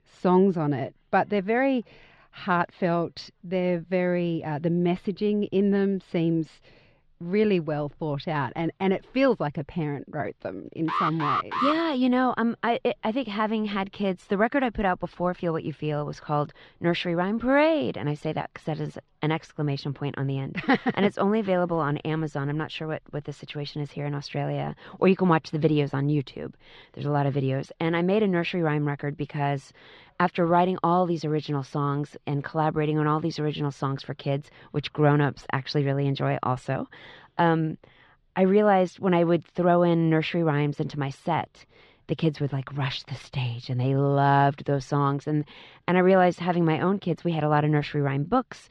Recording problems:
muffled; slightly; fading above 4 kHz
alarm; loud; at 11 s; peak level with the speech

